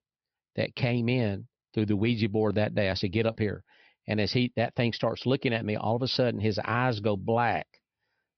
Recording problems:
high frequencies cut off; noticeable; nothing above 5.5 kHz

